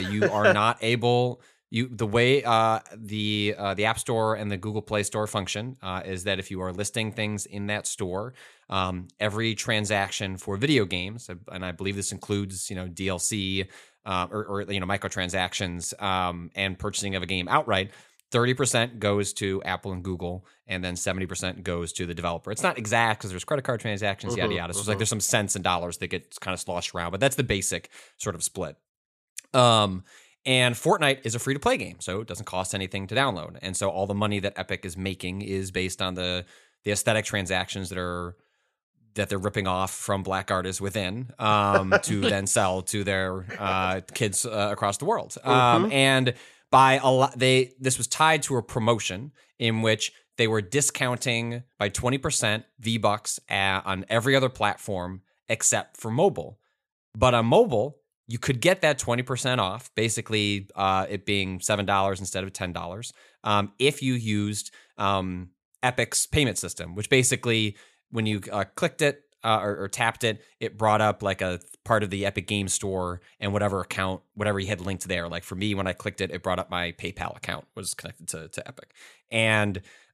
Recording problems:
abrupt cut into speech; at the start

